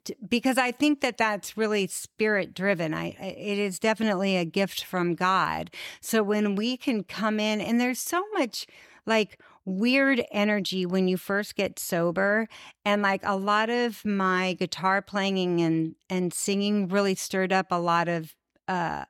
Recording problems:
none

